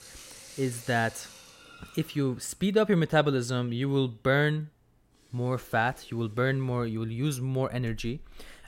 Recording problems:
household noises; faint; throughout; 20 dB below the speech

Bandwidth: 16 kHz